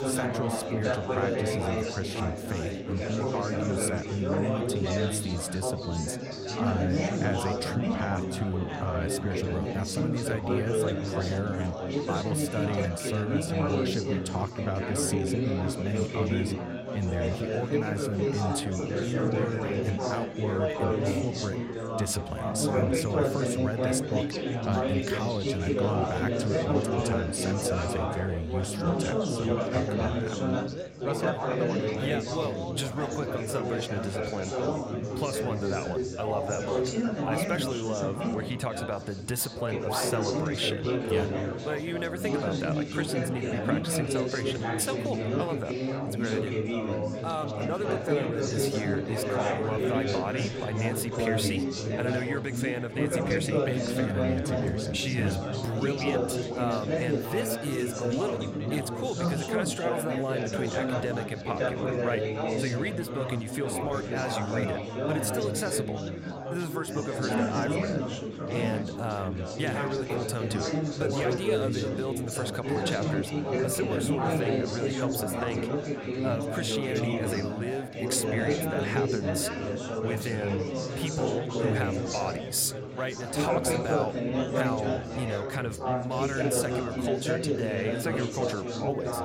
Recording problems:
chatter from many people; very loud; throughout; 3 dB above the speech

